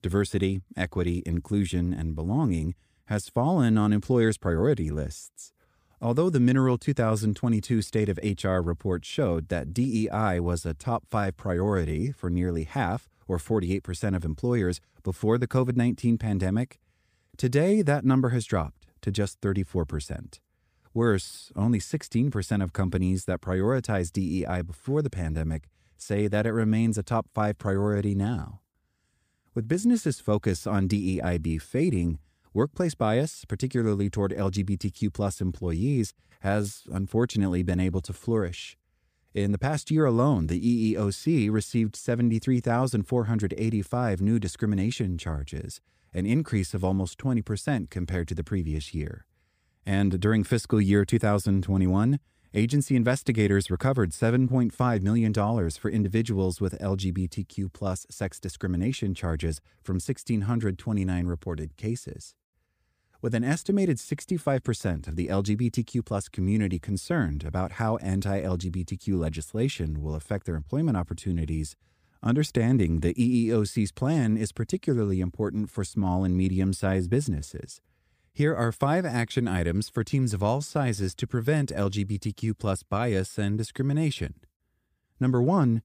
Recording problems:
none

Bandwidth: 15 kHz